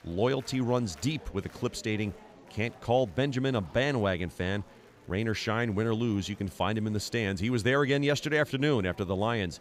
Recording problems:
murmuring crowd; faint; throughout; 25 dB below the speech

